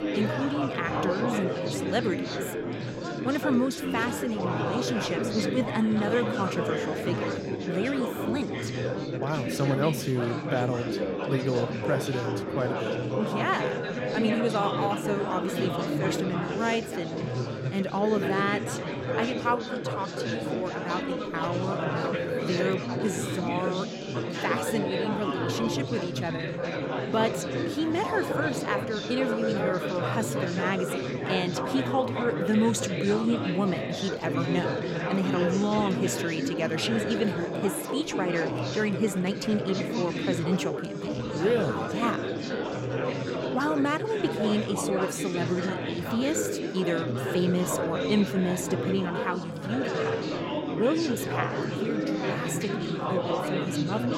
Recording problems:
chatter from many people; loud; throughout; as loud as the speech

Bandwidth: 16 kHz